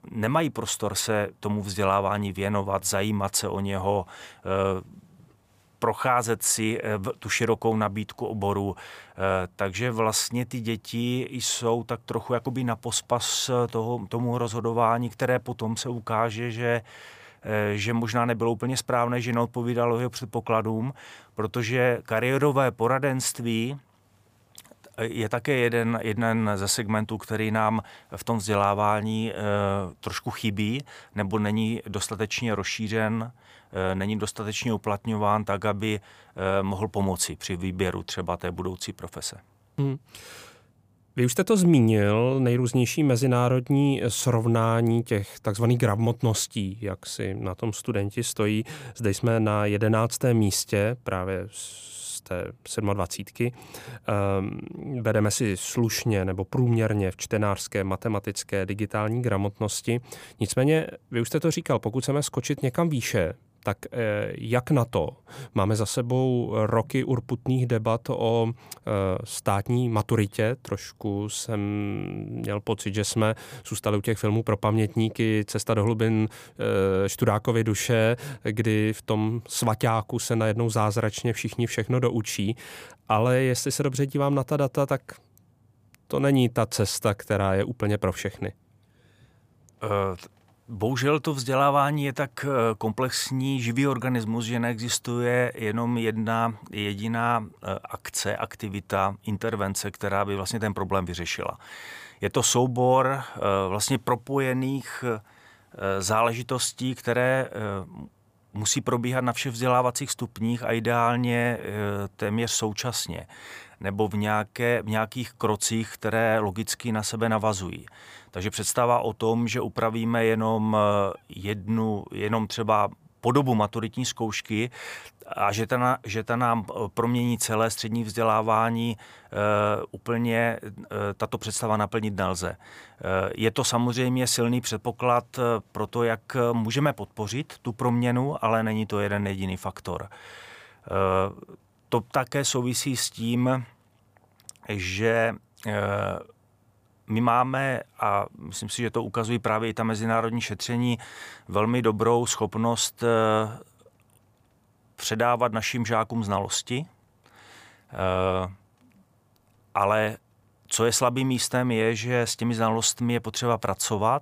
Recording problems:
none

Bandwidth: 15 kHz